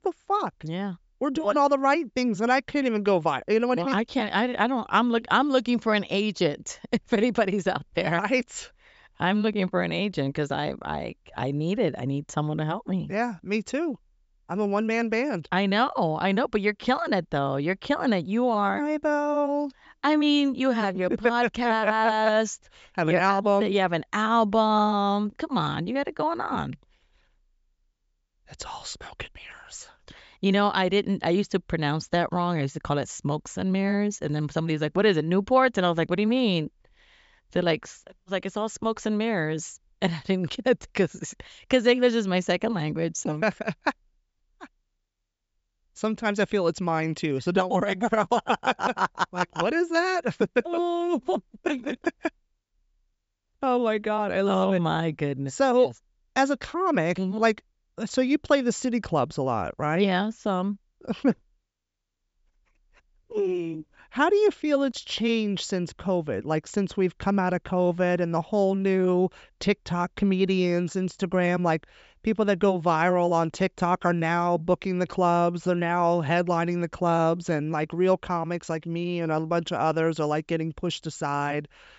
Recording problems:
high frequencies cut off; noticeable; nothing above 8 kHz

